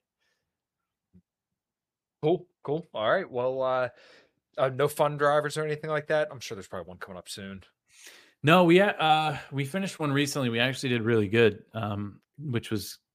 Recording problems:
none

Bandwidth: 15 kHz